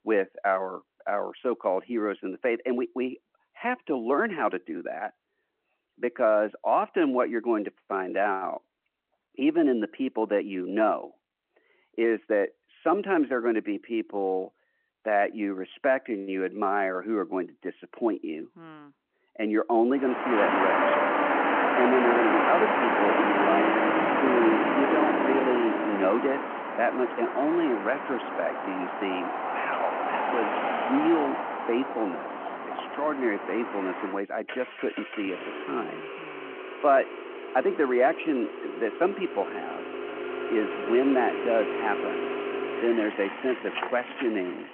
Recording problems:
phone-call audio
traffic noise; loud; from 20 s on; 1 dB below the speech

